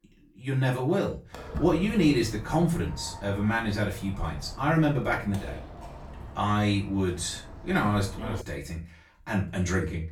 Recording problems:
off-mic speech; far
room echo; slight; dies away in 0.3 s
footsteps; noticeable; from 1.5 to 8.5 s; peak 8 dB below the speech

